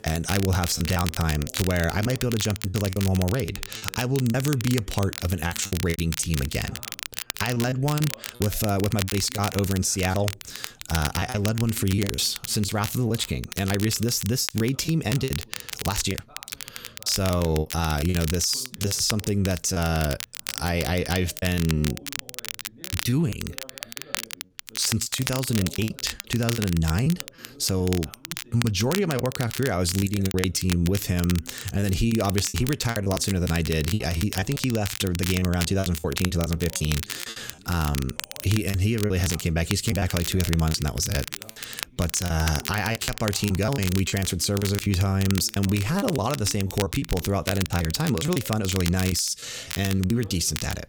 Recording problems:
crackle, like an old record; loud; 9 dB below the speech
voice in the background; faint; throughout; 25 dB below the speech
choppy; very; 10% of the speech affected

